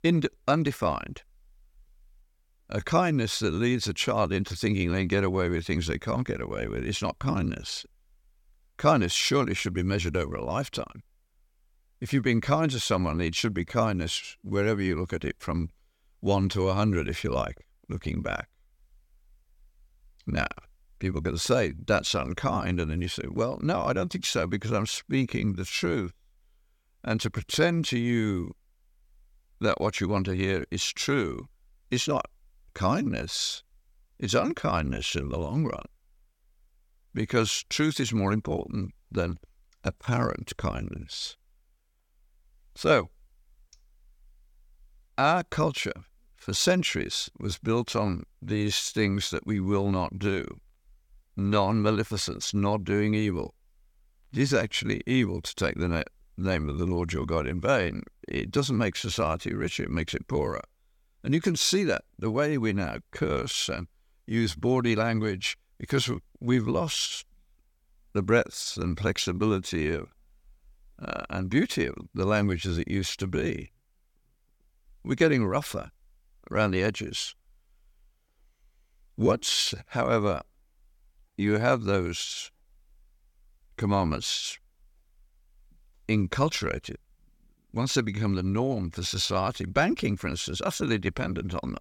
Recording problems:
none

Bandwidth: 17 kHz